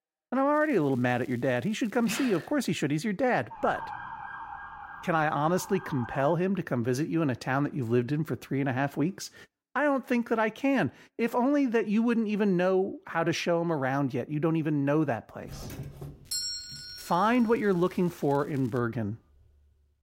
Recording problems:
crackling; faint; from 0.5 to 2.5 s and from 16 to 19 s; 30 dB below the speech
siren; faint; from 3.5 to 6.5 s; peak 10 dB below the speech
doorbell; noticeable; from 15 to 17 s; peak 3 dB below the speech

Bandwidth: 16 kHz